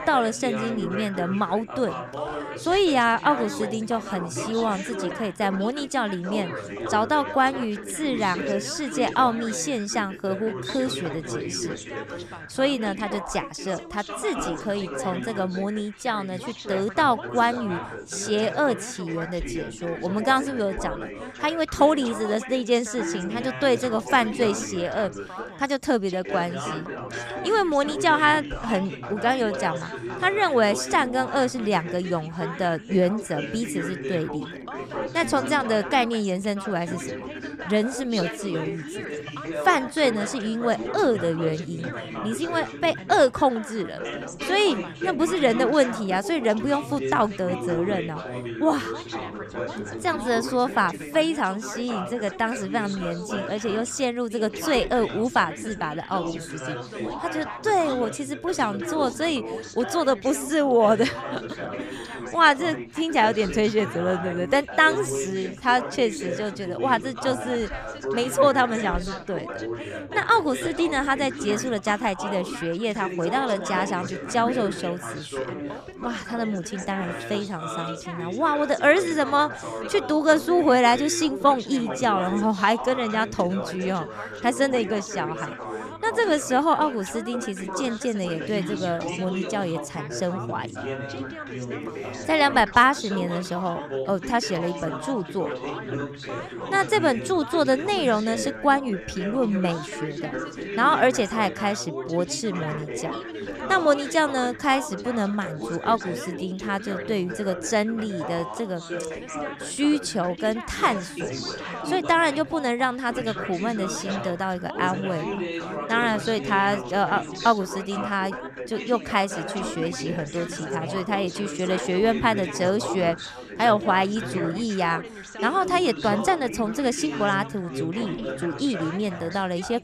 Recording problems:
background chatter; loud; throughout; 3 voices, 9 dB below the speech

